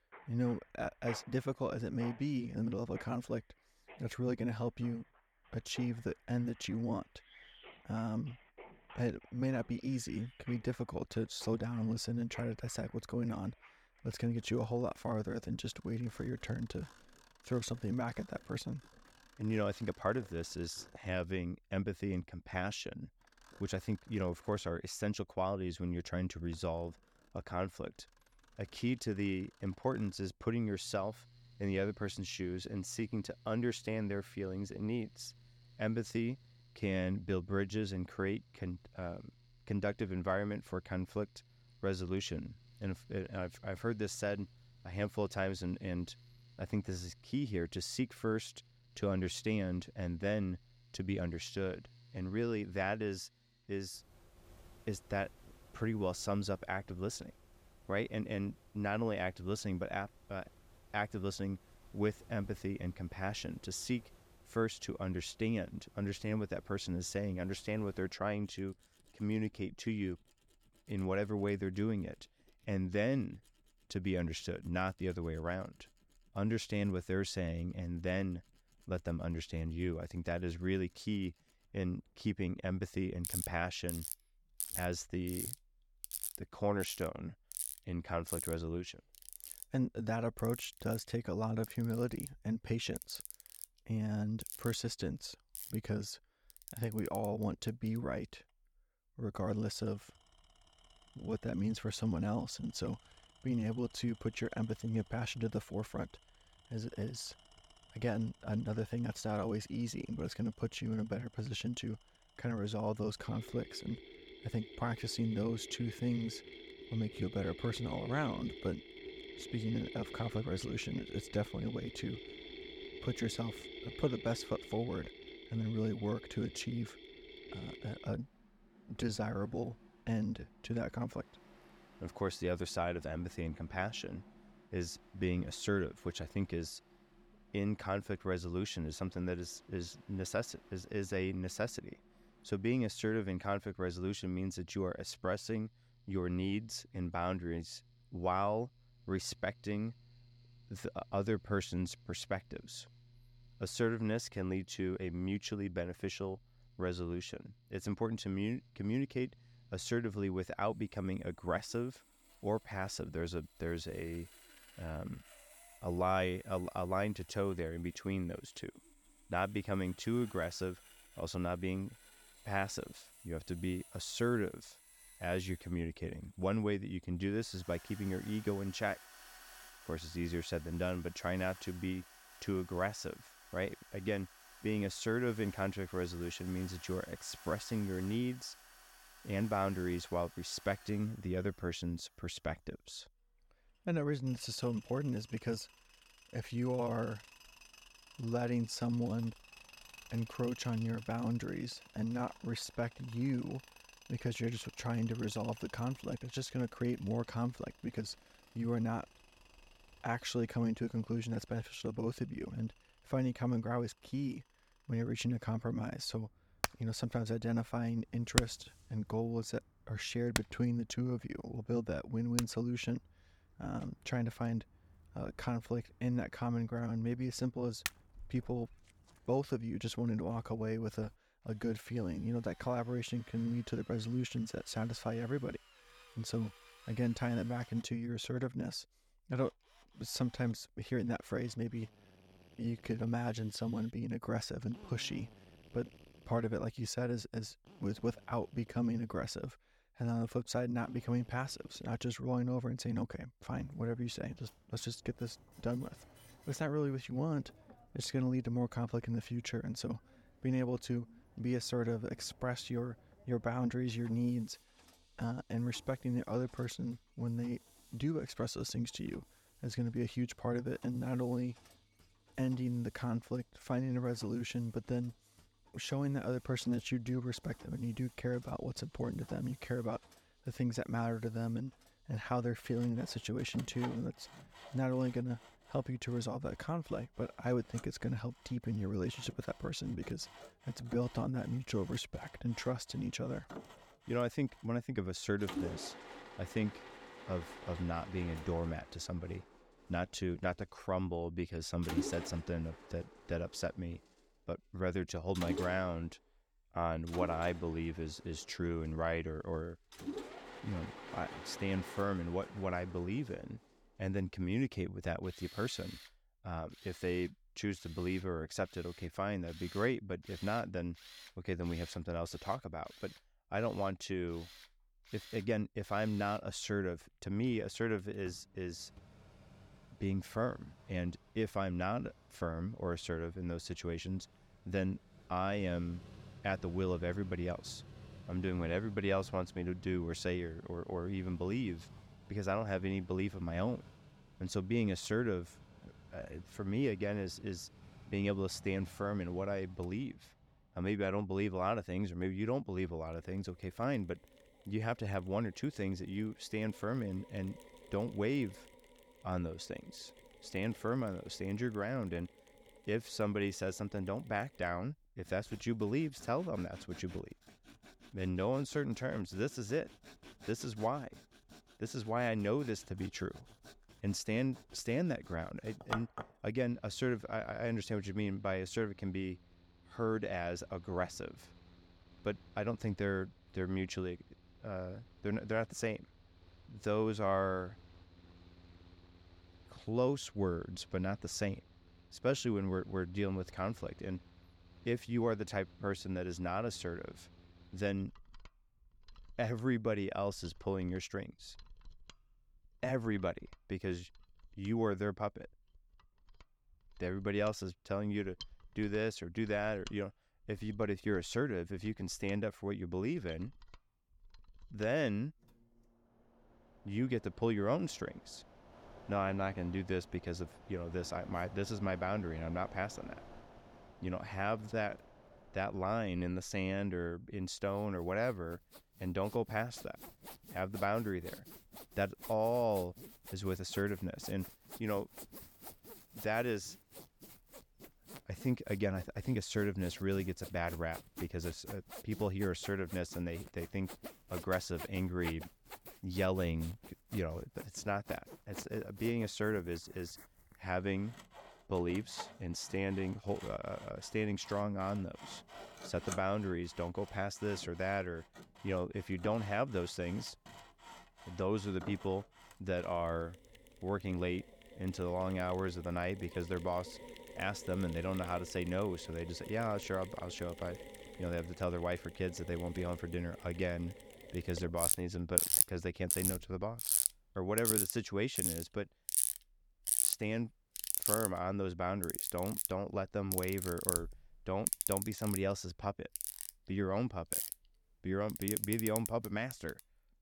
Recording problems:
machinery noise; loud; throughout; 7 dB below the speech

